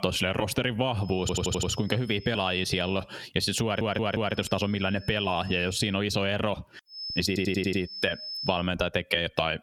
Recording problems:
squashed, flat; somewhat
high-pitched whine; noticeable; from 1 to 3 s, from 4 to 6 s and from 7 to 8.5 s; 5 kHz, 15 dB below the speech
audio stuttering; at 1 s, at 3.5 s and at 7.5 s

